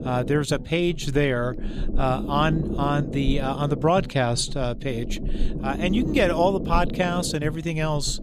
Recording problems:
low rumble; noticeable; throughout; 10 dB below the speech

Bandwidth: 14.5 kHz